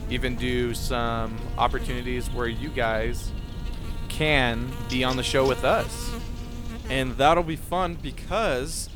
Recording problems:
electrical hum; noticeable; throughout; 60 Hz, 15 dB below the speech
low rumble; faint; throughout; 25 dB below the speech

